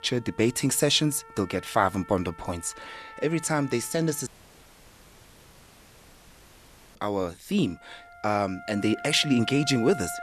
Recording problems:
background music; noticeable; throughout; 15 dB below the speech
audio cutting out; at 4.5 s for 2.5 s

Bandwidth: 13.5 kHz